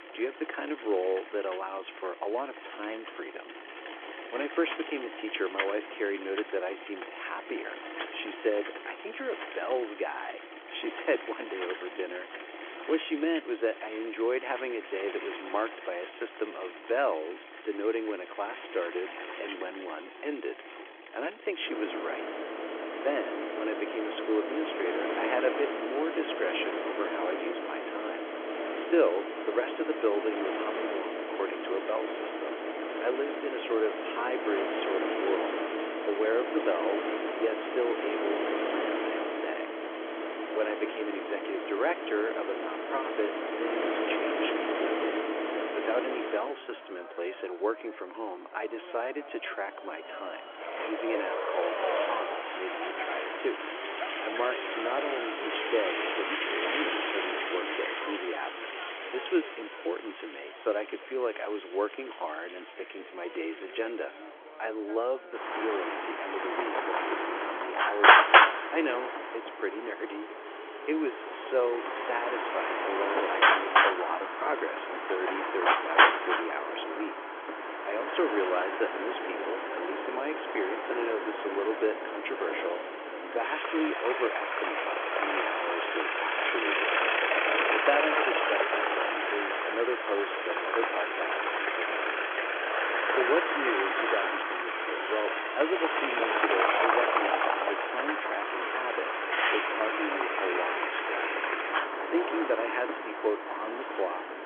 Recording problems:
phone-call audio; nothing above 3.5 kHz
traffic noise; very loud; throughout; 4 dB above the speech

